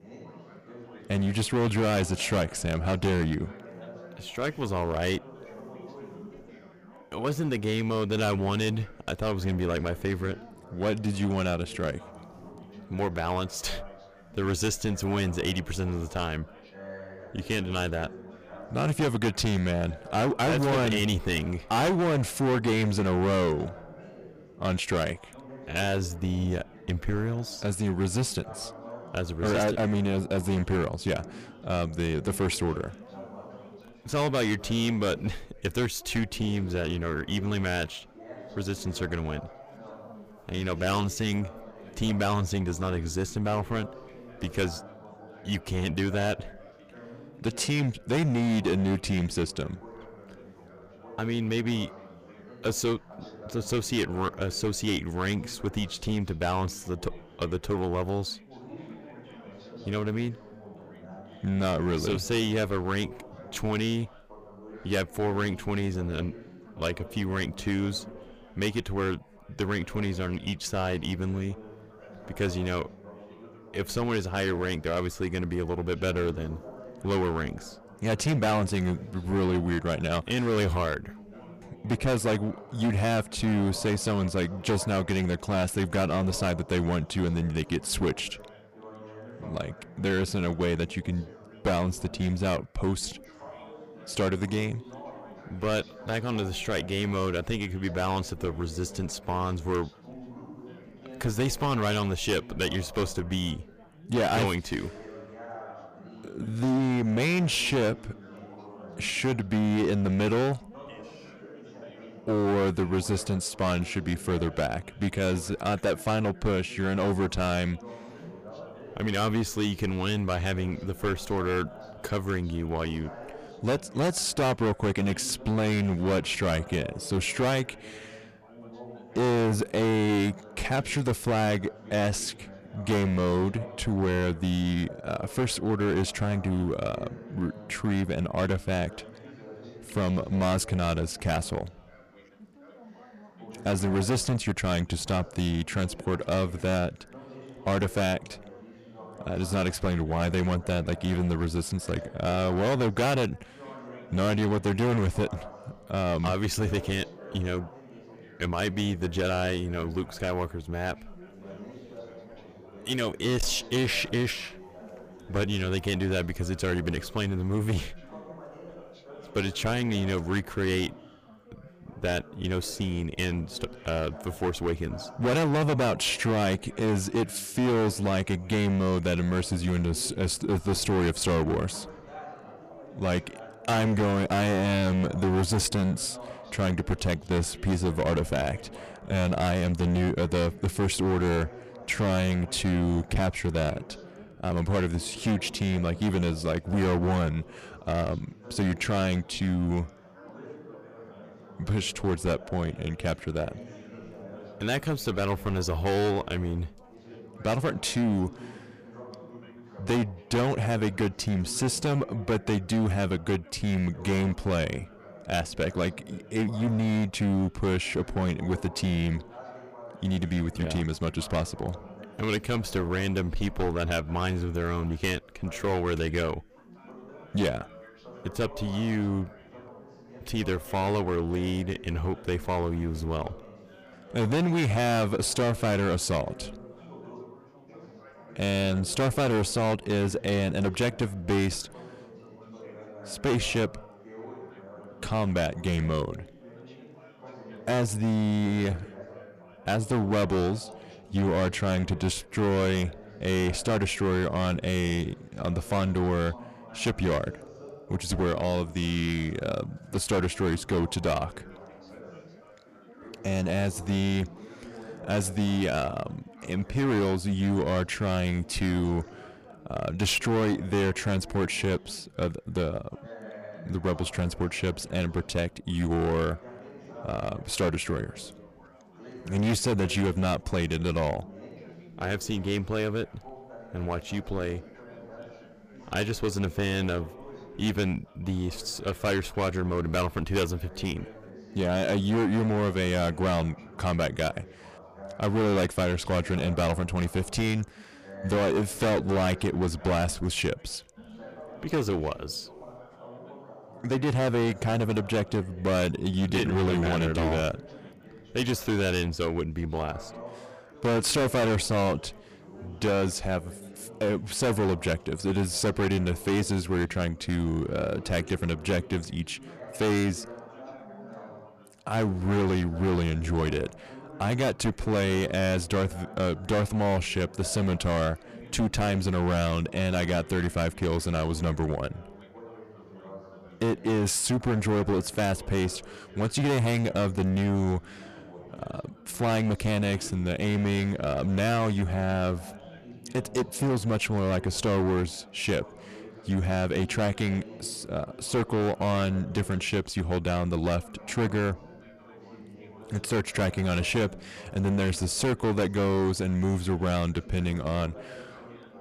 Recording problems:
distortion; heavy; 11% of the sound clipped
background chatter; noticeable; throughout; 4 voices, 20 dB below the speech

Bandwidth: 15 kHz